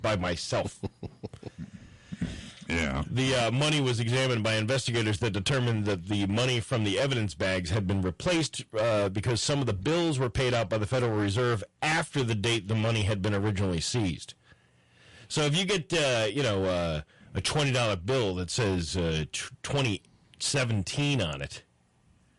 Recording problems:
distortion; heavy; 20% of the sound clipped
garbled, watery; slightly; nothing above 11 kHz

